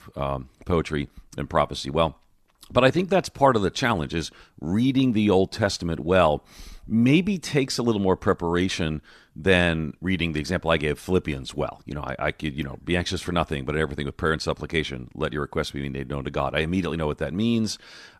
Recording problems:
none

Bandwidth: 14 kHz